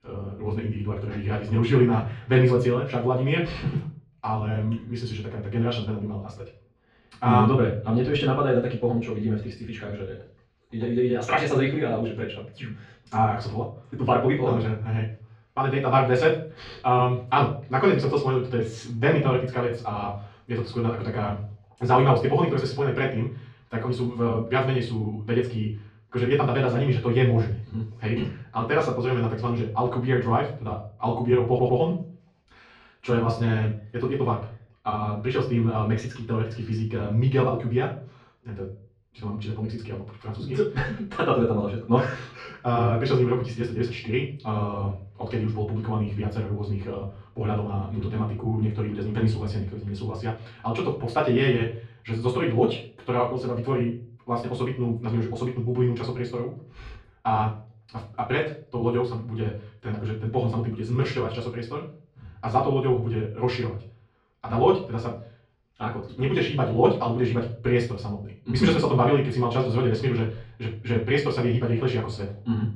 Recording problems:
off-mic speech; far
wrong speed, natural pitch; too fast; 1.6 times normal speed
muffled; slightly; fading above 4 kHz
room echo; slight; dies away in 0.3 s
audio stuttering; at 31 s

